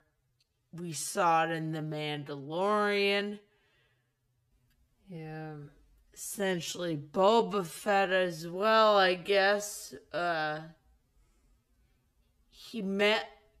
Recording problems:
wrong speed, natural pitch; too slow; 0.5 times normal speed

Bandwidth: 14.5 kHz